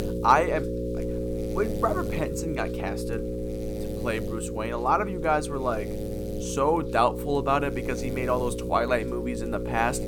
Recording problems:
electrical hum; loud; throughout; 60 Hz, 9 dB below the speech

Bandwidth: 17.5 kHz